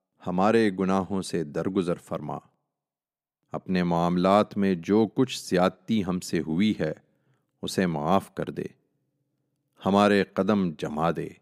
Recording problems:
none

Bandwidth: 15.5 kHz